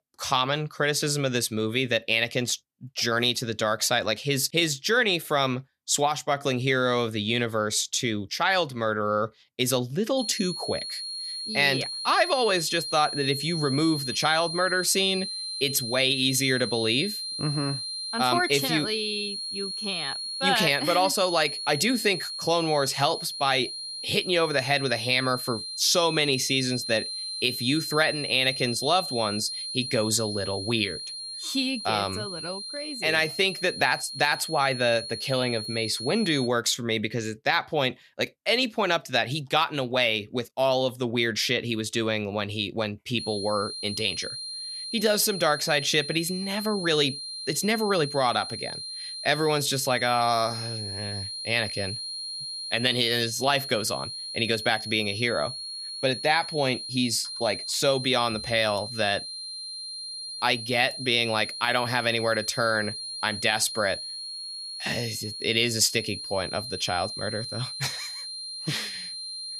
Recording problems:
high-pitched whine; loud; from 10 to 36 s and from 43 s on; 4 kHz, 7 dB below the speech

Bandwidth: 14 kHz